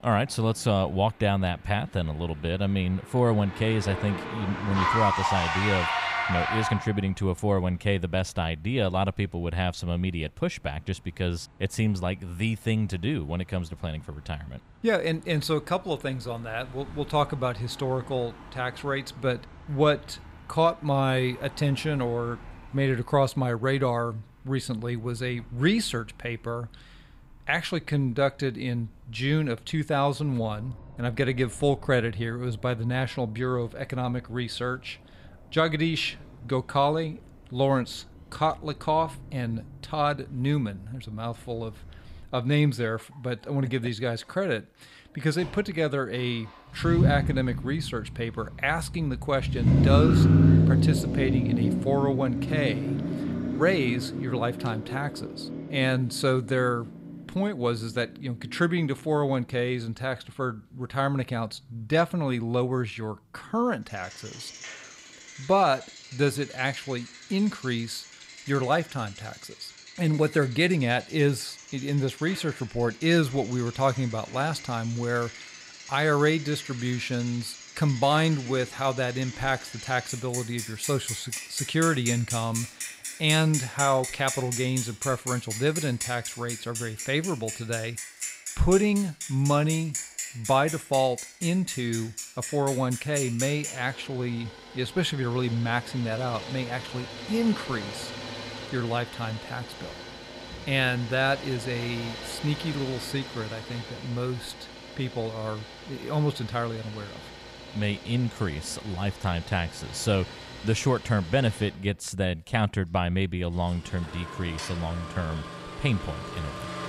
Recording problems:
traffic noise; loud; throughout; 4 dB below the speech

